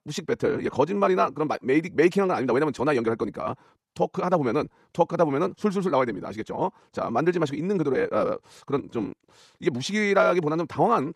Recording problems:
wrong speed, natural pitch; too fast; 1.5 times normal speed

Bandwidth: 13.5 kHz